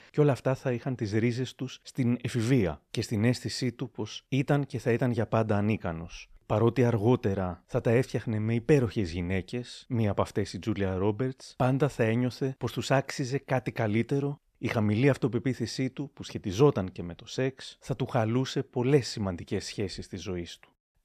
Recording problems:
none

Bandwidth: 14 kHz